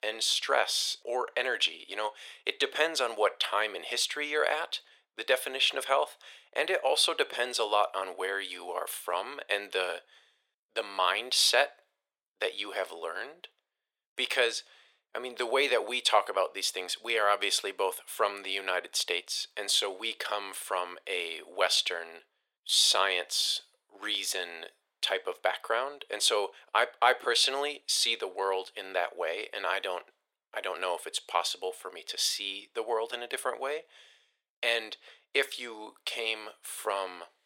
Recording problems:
thin; very; fading below 450 Hz

